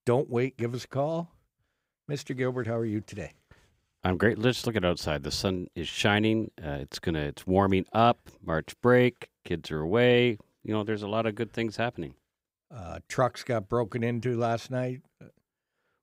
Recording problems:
none

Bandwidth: 15.5 kHz